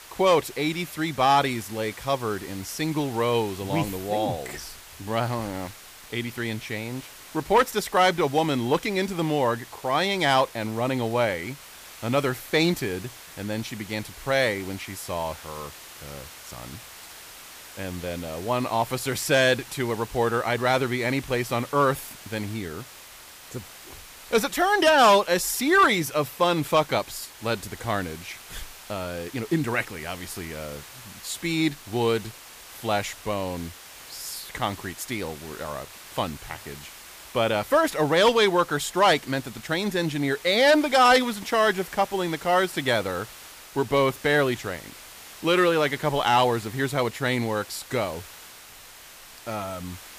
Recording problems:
hiss; noticeable; throughout; 20 dB below the speech

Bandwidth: 15 kHz